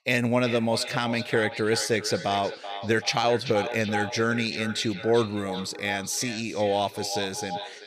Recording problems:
echo of what is said; strong; throughout; 380 ms later, 10 dB below the speech

